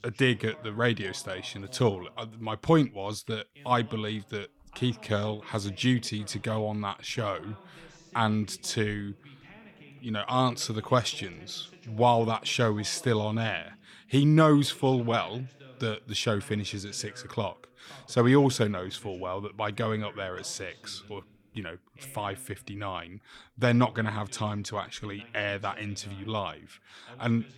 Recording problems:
voice in the background; faint; throughout; 25 dB below the speech

